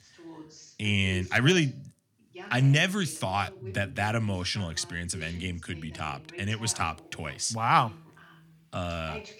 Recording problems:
voice in the background; noticeable; throughout; 20 dB below the speech

